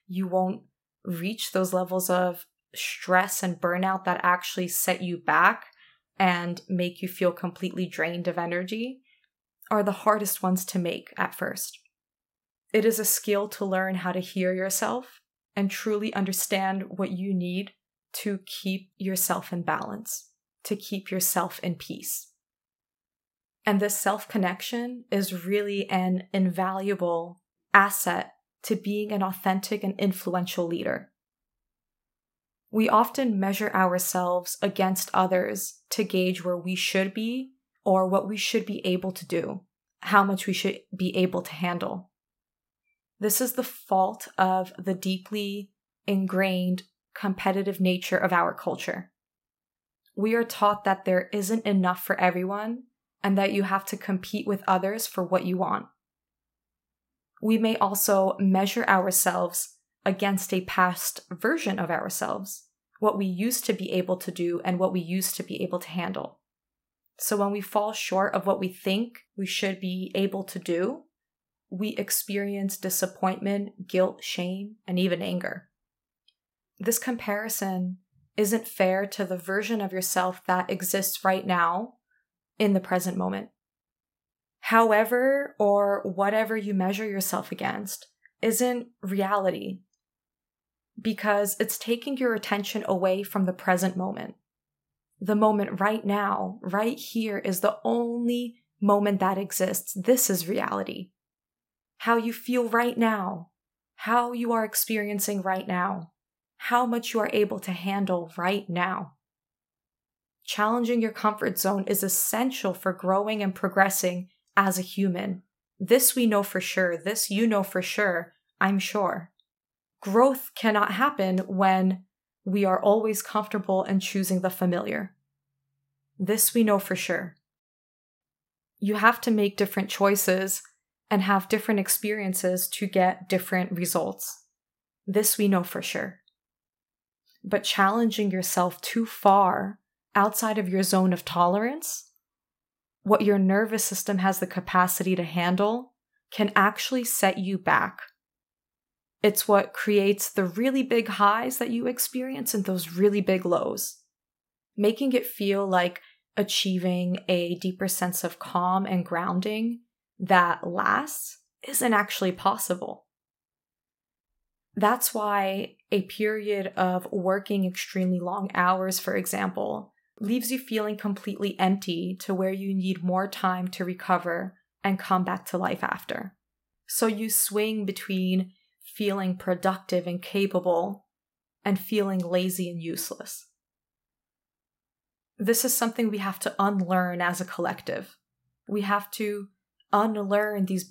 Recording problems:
none

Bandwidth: 16 kHz